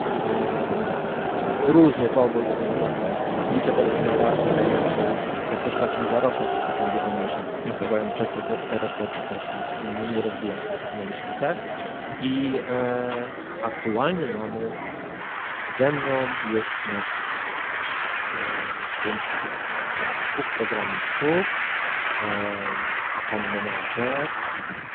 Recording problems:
phone-call audio; poor line
traffic noise; very loud; throughout; 1 dB above the speech

